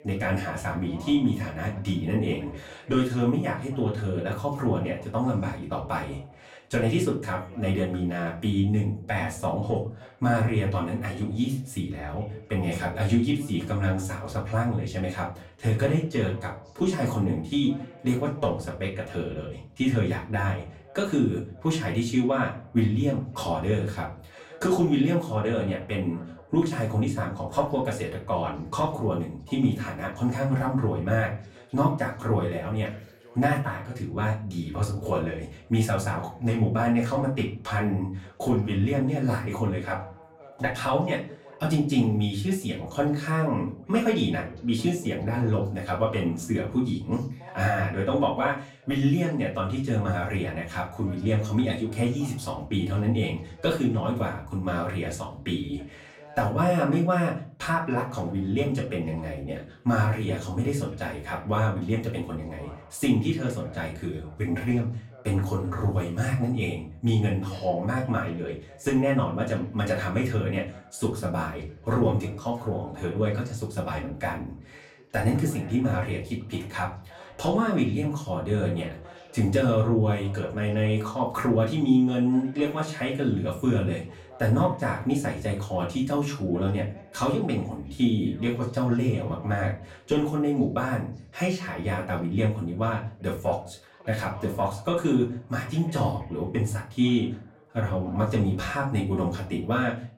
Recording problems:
off-mic speech; far
room echo; slight; dies away in 0.3 s
voice in the background; faint; throughout; 25 dB below the speech

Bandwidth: 16 kHz